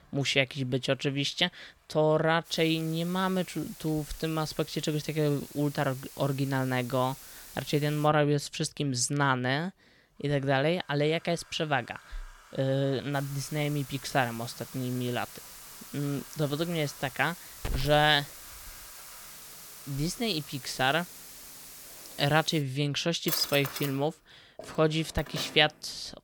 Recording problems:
household noises; noticeable; throughout; 15 dB below the speech
hiss; noticeable; from 2.5 to 8 s and from 13 to 23 s; 15 dB below the speech

